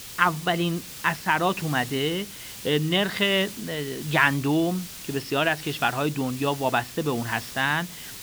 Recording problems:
high frequencies cut off; noticeable; nothing above 5.5 kHz
hiss; noticeable; throughout; 15 dB below the speech

